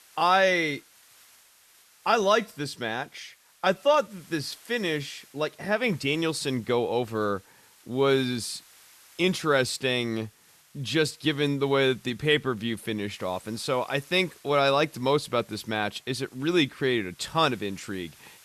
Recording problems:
hiss; faint; throughout; 25 dB below the speech

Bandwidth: 13.5 kHz